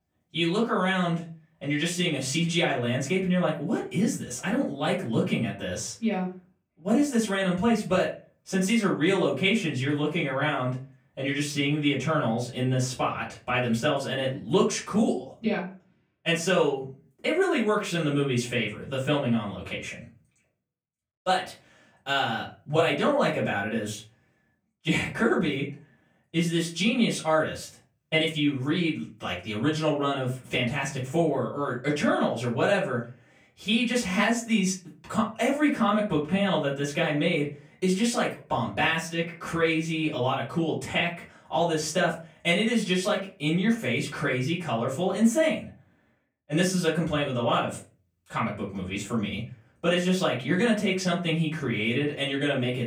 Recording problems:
off-mic speech; far
room echo; slight; dies away in 0.3 s

